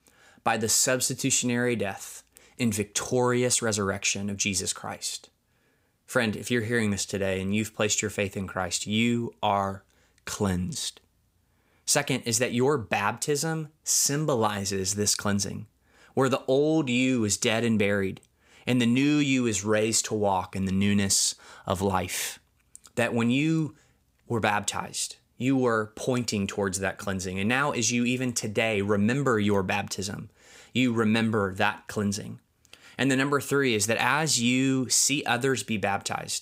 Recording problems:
none

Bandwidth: 15.5 kHz